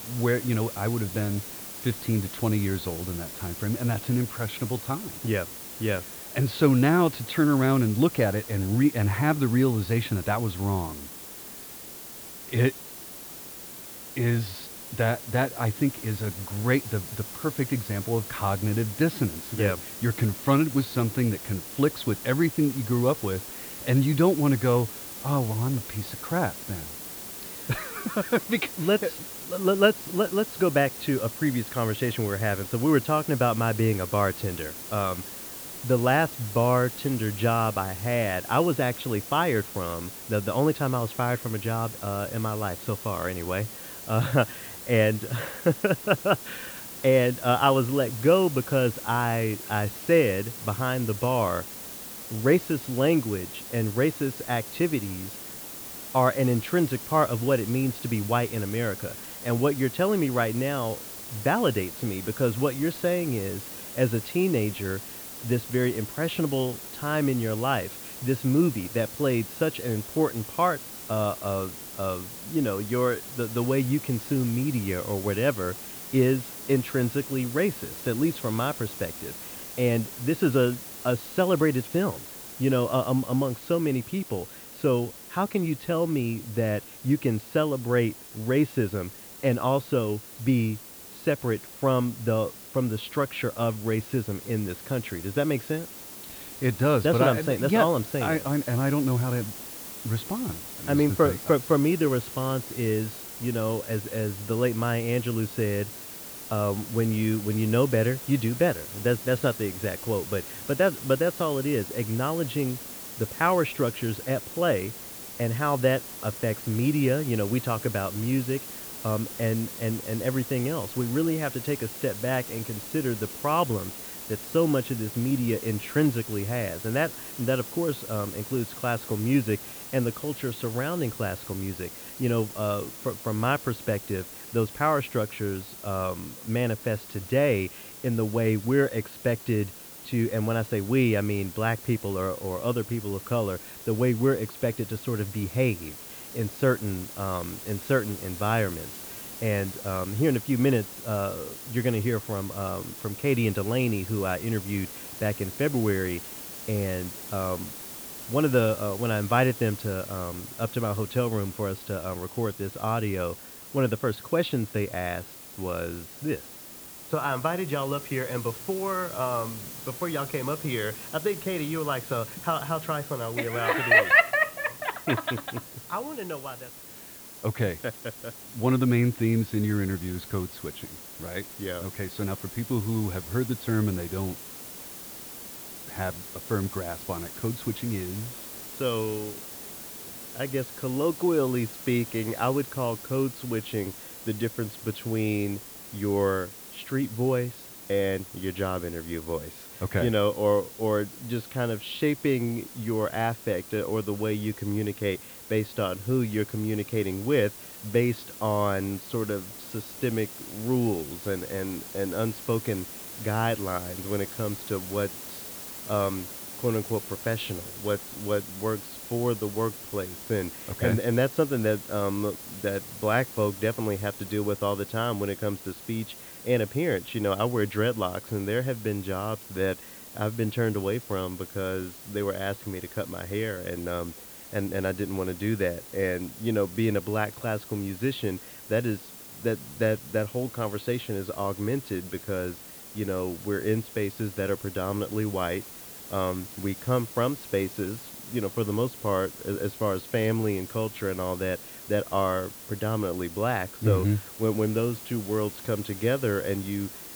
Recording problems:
muffled; slightly; fading above 4 kHz
hiss; loud; throughout; 10 dB below the speech

